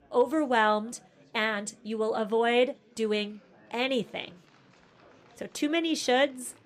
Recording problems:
chatter from many people; faint; throughout; 30 dB below the speech

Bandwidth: 14.5 kHz